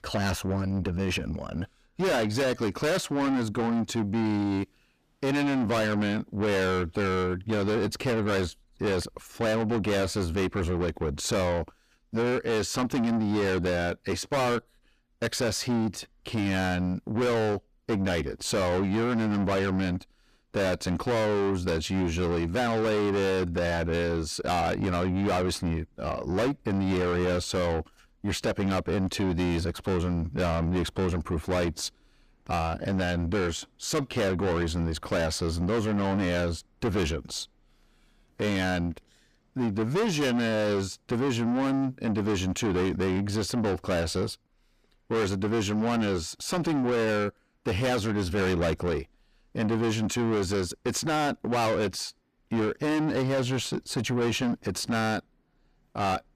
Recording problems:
distortion; heavy; 6 dB below the speech

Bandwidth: 15 kHz